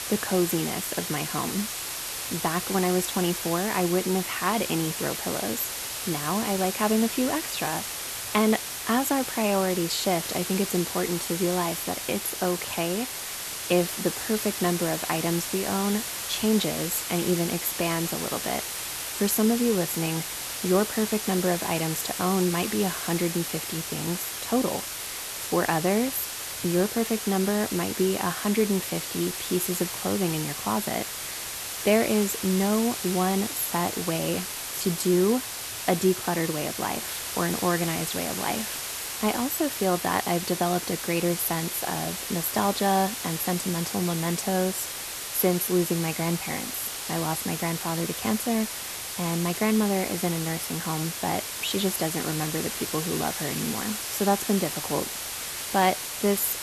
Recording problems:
hiss; loud; throughout; 4 dB below the speech

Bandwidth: 13.5 kHz